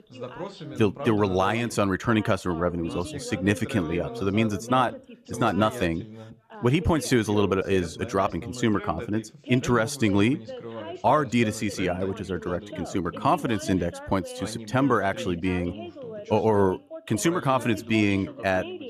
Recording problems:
background chatter; noticeable; throughout; 2 voices, 10 dB below the speech

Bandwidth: 14.5 kHz